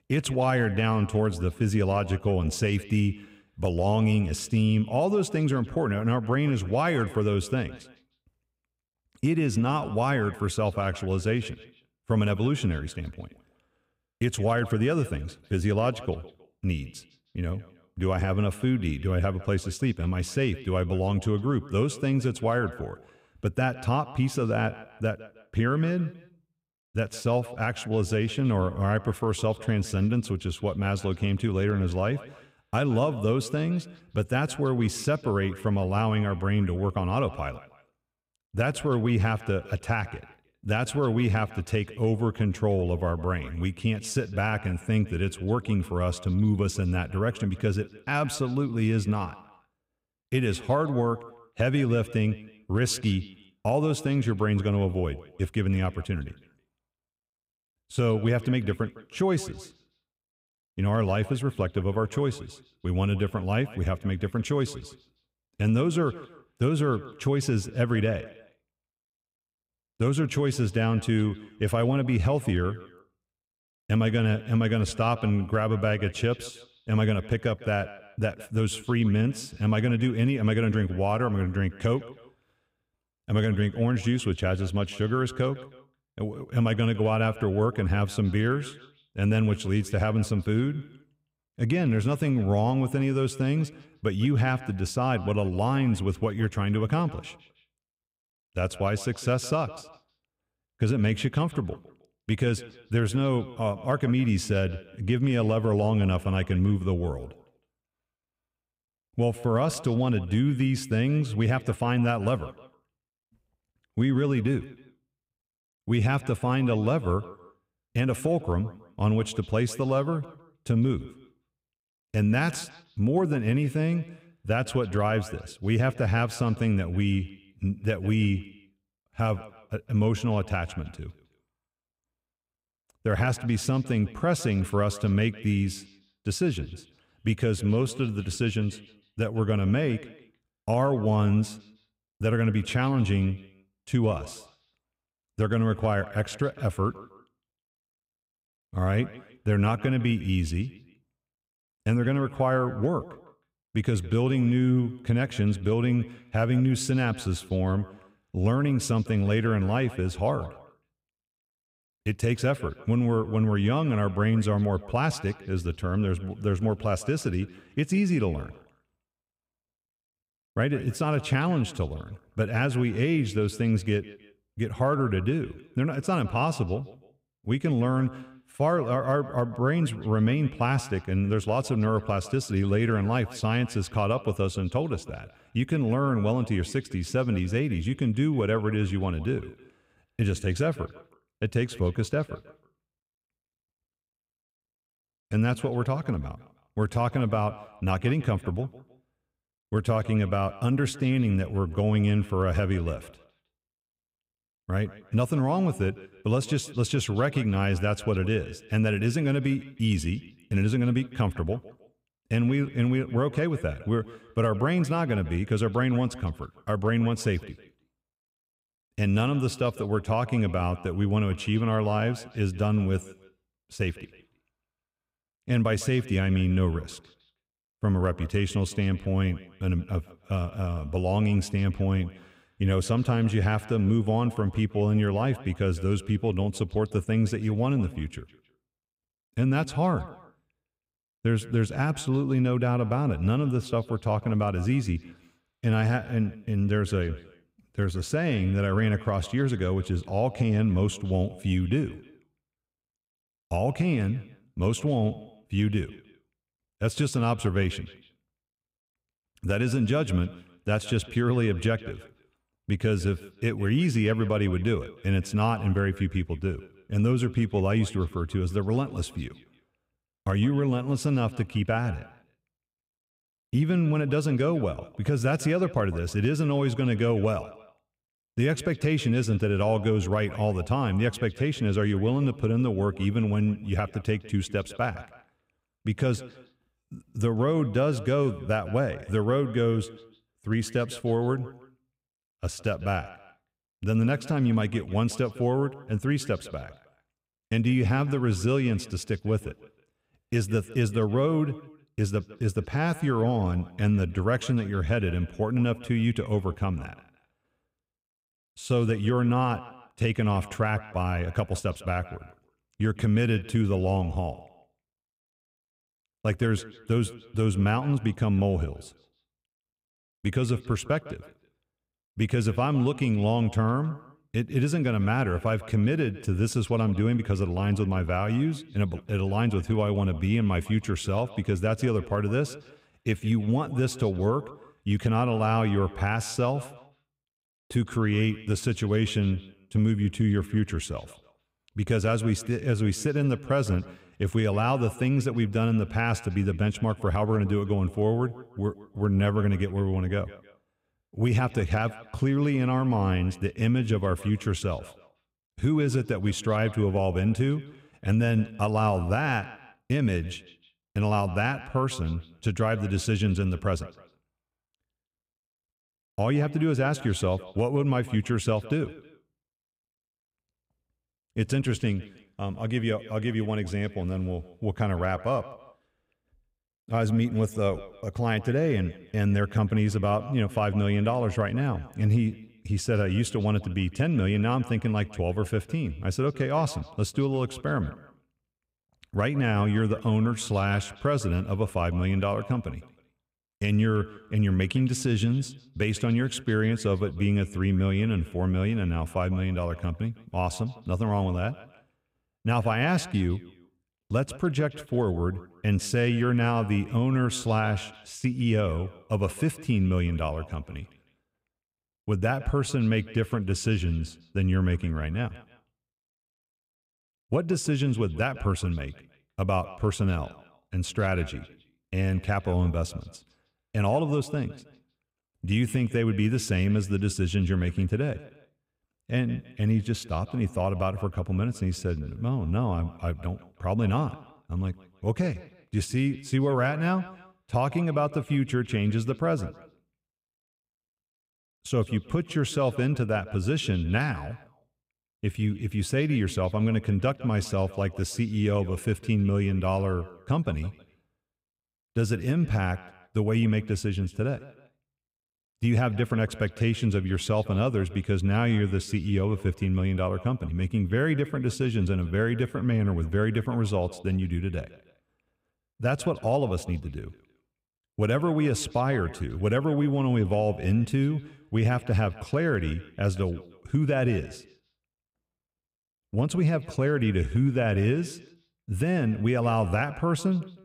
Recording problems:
echo of what is said; faint; throughout; 160 ms later, 20 dB below the speech

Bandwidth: 15.5 kHz